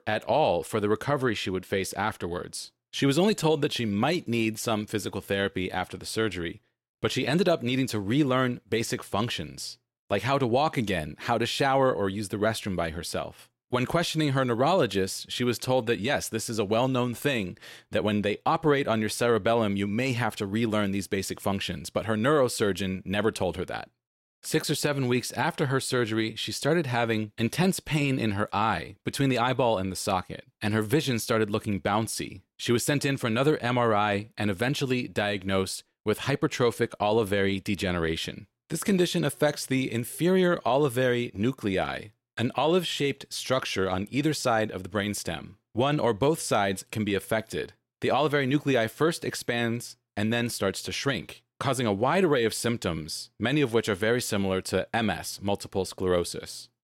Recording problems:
none

